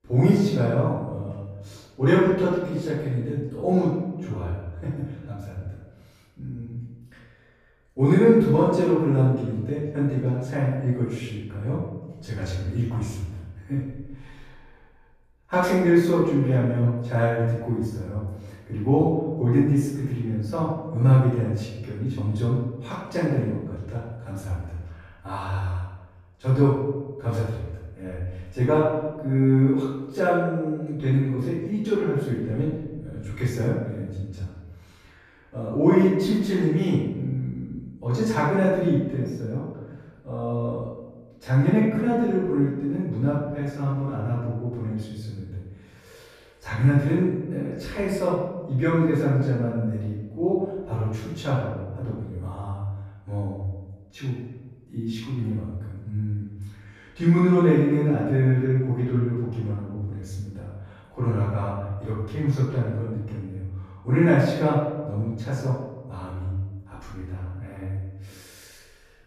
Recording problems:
room echo; strong; dies away in 1 s
off-mic speech; far

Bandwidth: 14.5 kHz